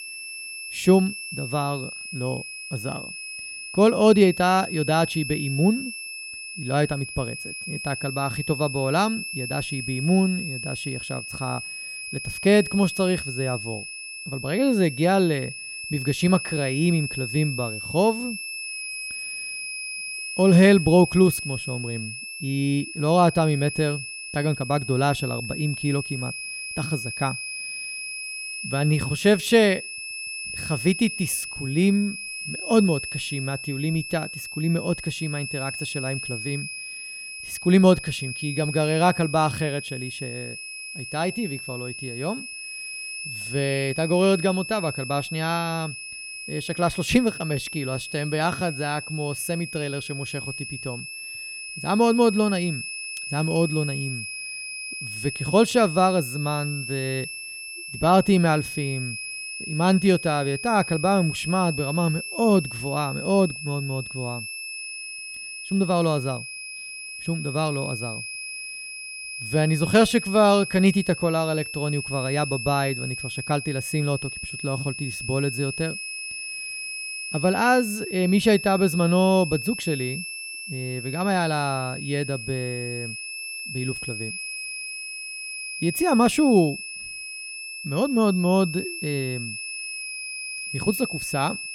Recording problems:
high-pitched whine; loud; throughout; 2.5 kHz, 8 dB below the speech

